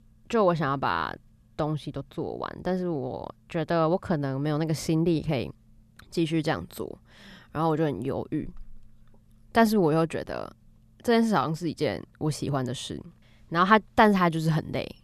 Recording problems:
none

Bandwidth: 14 kHz